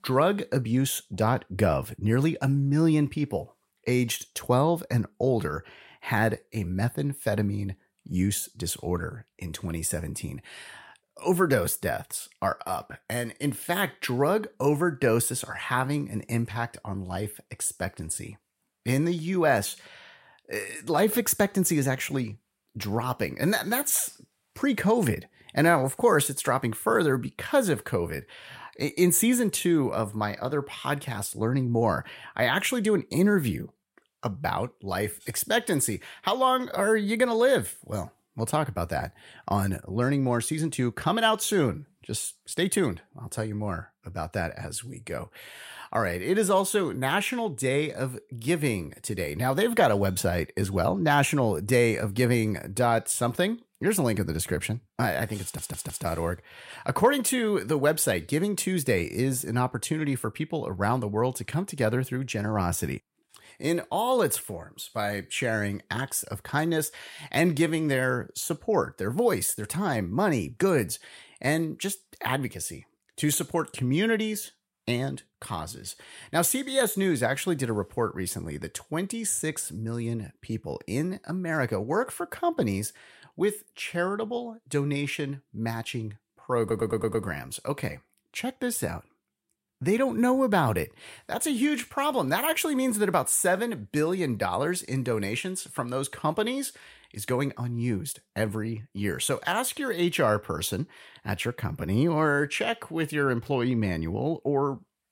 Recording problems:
audio stuttering; at 55 s and at 1:27

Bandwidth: 16 kHz